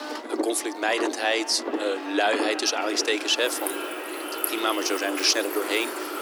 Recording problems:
echo of what is said; noticeable; throughout; 450 ms later, 10 dB below the speech
thin; somewhat; fading below 300 Hz
traffic noise; loud; throughout; 7 dB below the speech
background music; noticeable; throughout; 20 dB below the speech

